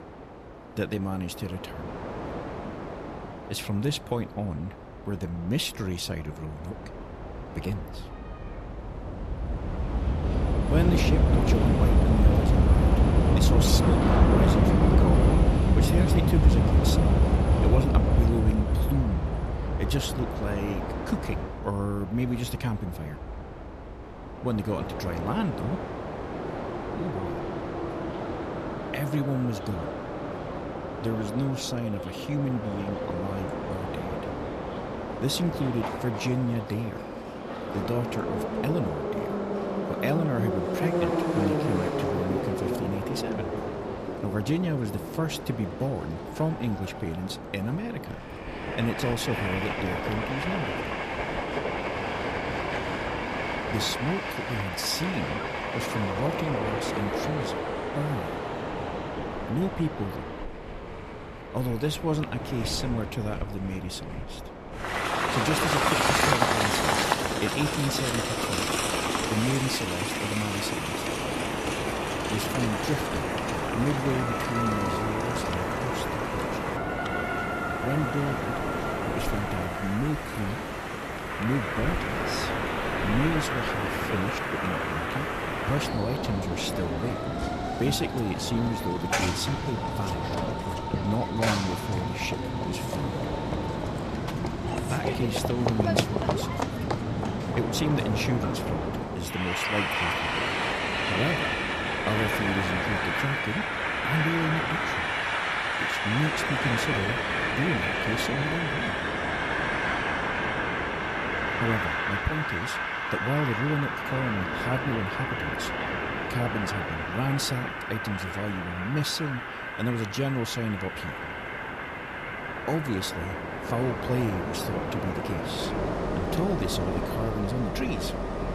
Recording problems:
train or aircraft noise; very loud; throughout; 3 dB above the speech

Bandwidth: 14 kHz